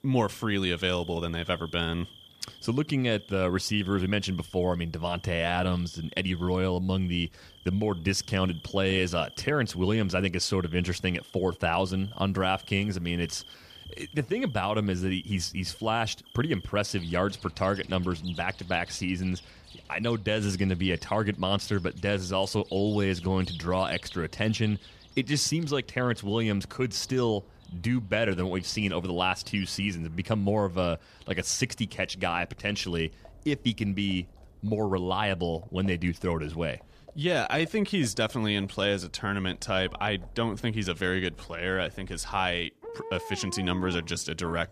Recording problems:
animal sounds; faint; throughout; 20 dB below the speech

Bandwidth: 14.5 kHz